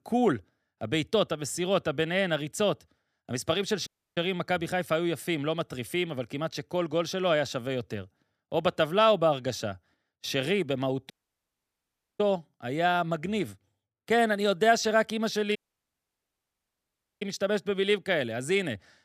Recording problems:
audio cutting out; at 4 s, at 11 s for 1 s and at 16 s for 1.5 s

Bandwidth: 14.5 kHz